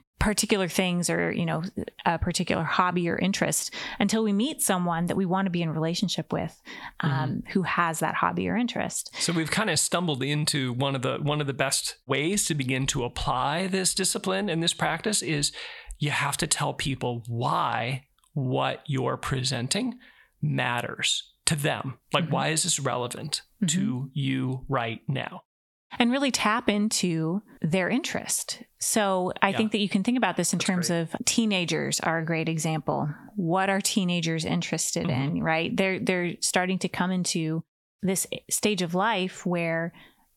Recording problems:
squashed, flat; heavily

